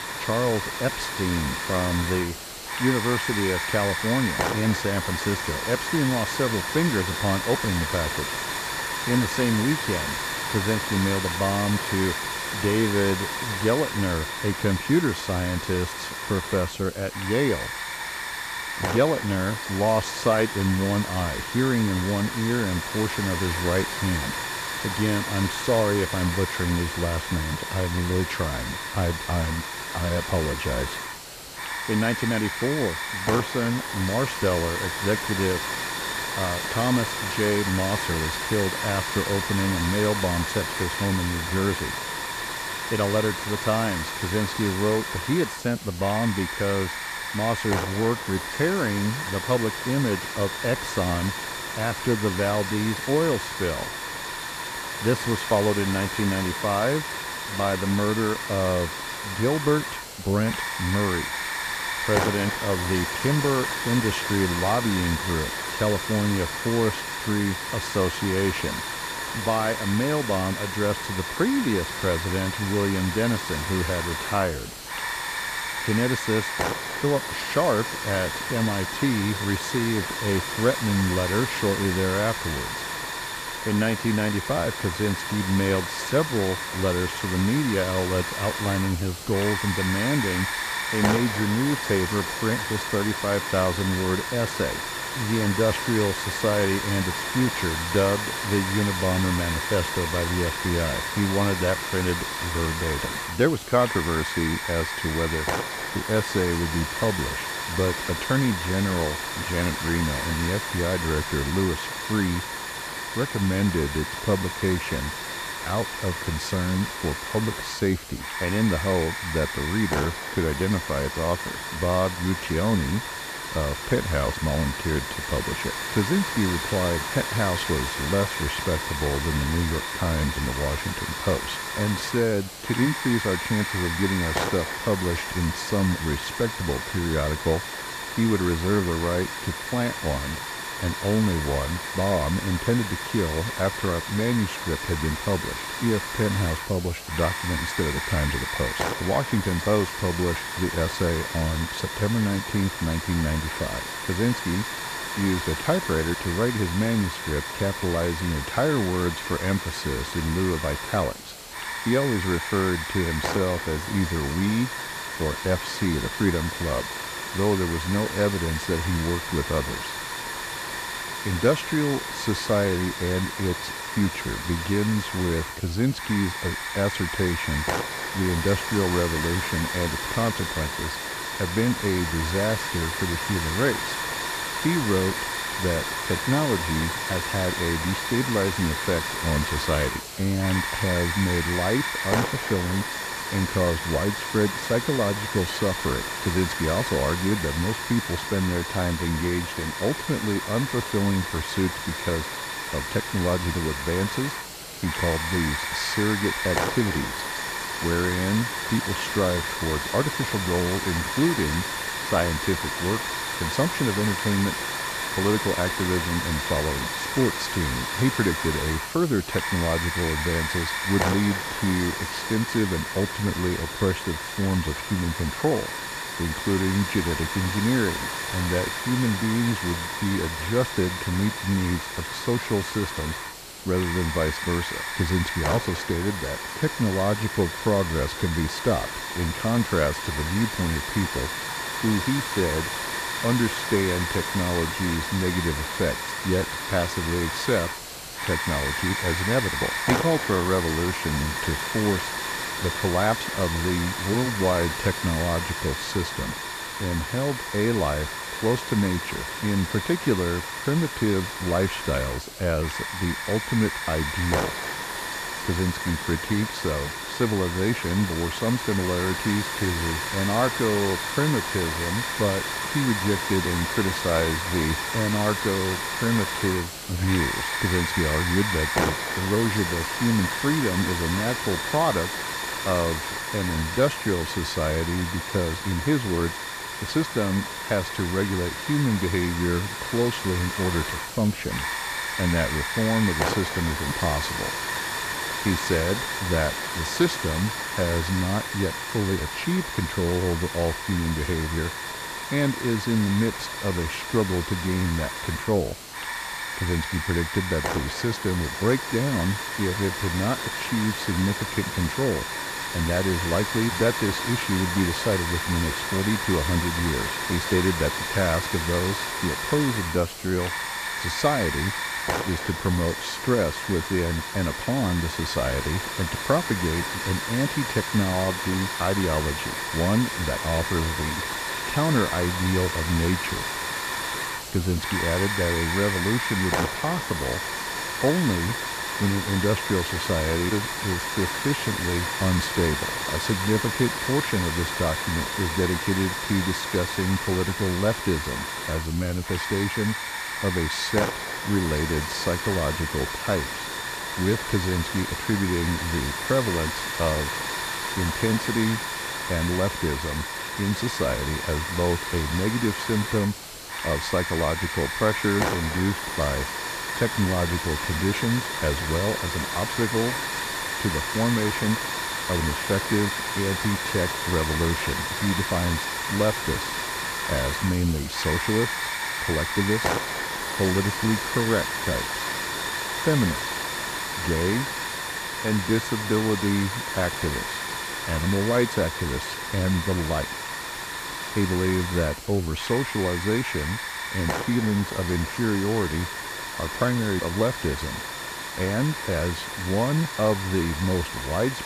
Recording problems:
hiss; loud; throughout; 2 dB below the speech

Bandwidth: 14.5 kHz